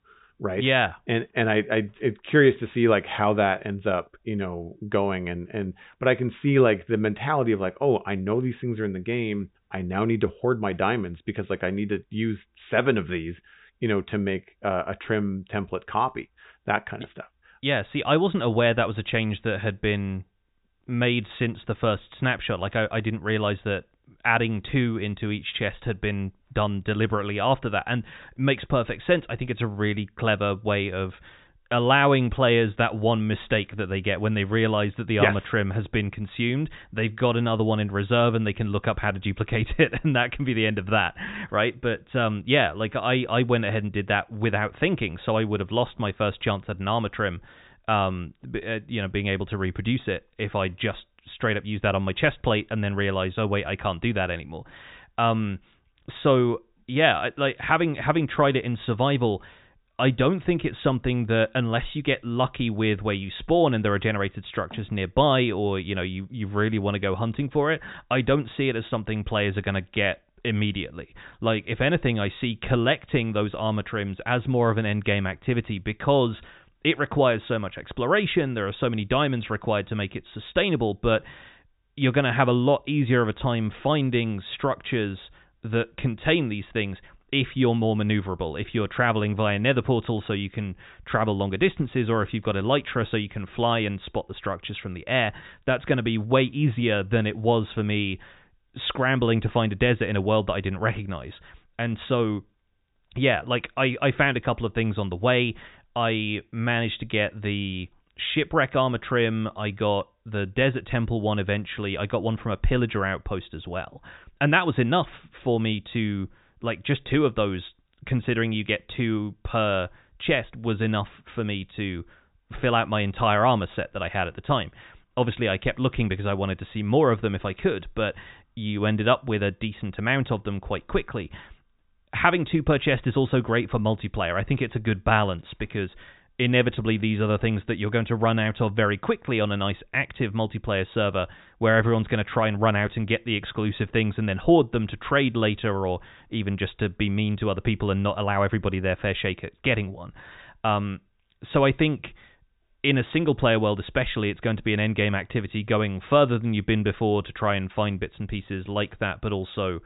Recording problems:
high frequencies cut off; severe; nothing above 4 kHz

